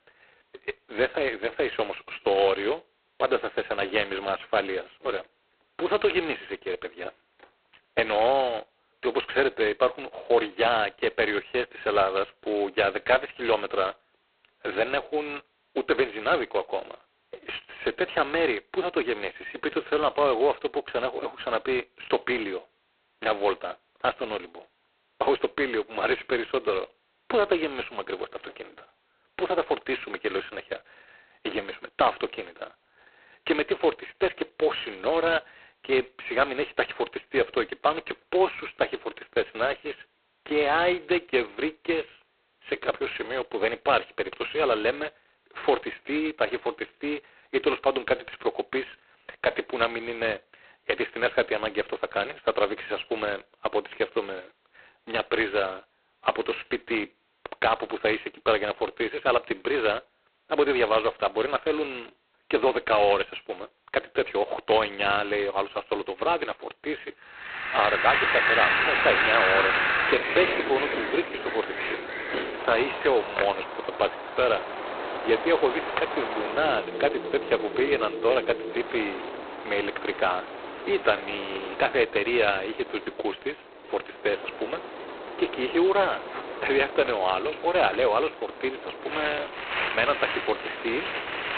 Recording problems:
phone-call audio; poor line; nothing above 4 kHz
wind in the background; loud; from 1:08 on; 2 dB below the speech

